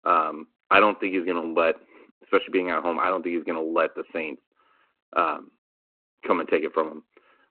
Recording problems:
phone-call audio

